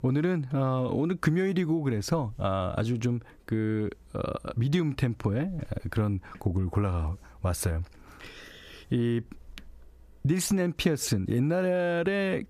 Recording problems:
squashed, flat; heavily

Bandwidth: 14.5 kHz